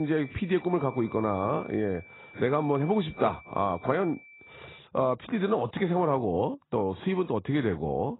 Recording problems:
garbled, watery; badly; nothing above 4 kHz
high-pitched whine; faint; until 5 s; 2.5 kHz, 20 dB below the speech
abrupt cut into speech; at the start

